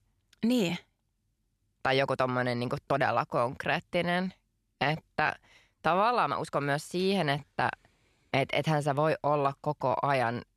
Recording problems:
uneven, jittery; strongly; from 0.5 to 10 s

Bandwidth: 13.5 kHz